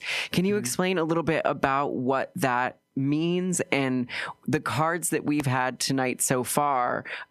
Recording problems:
squashed, flat; heavily

